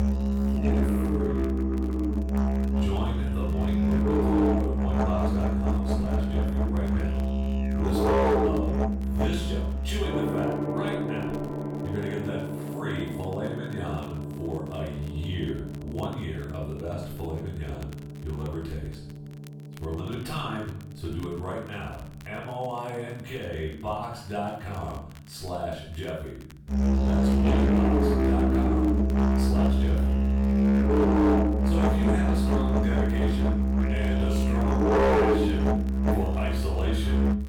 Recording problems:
off-mic speech; far
room echo; noticeable; dies away in 0.6 s
distortion; slight; 6% of the sound clipped
background music; very loud; throughout; 9 dB above the speech
crackle, like an old record; faint; 20 dB below the speech

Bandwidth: 18.5 kHz